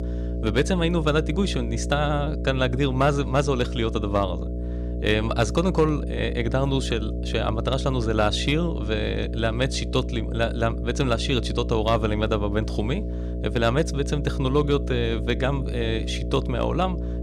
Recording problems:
electrical hum; noticeable; throughout; 60 Hz, 10 dB below the speech

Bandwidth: 15 kHz